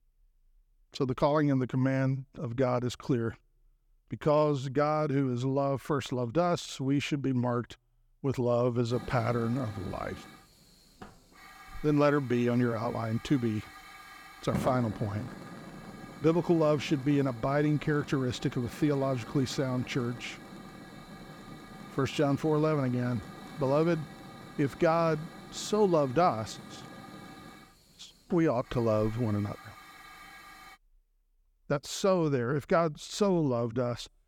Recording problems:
hiss; noticeable; from 9 to 31 s; 15 dB below the speech

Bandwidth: 18.5 kHz